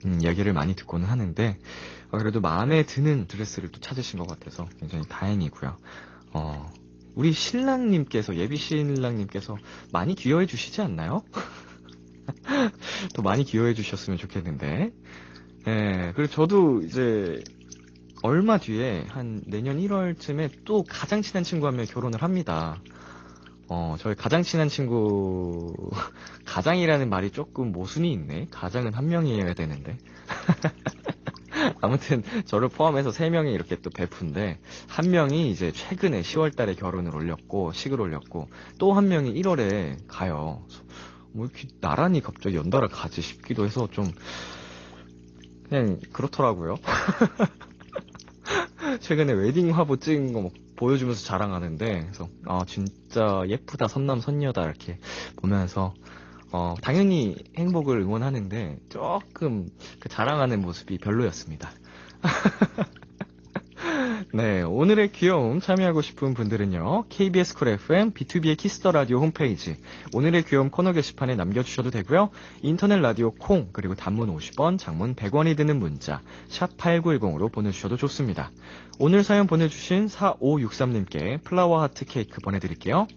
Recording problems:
garbled, watery; slightly; nothing above 6.5 kHz
electrical hum; faint; throughout; 60 Hz, 25 dB below the speech

